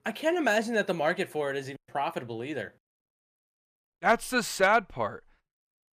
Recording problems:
none

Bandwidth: 15 kHz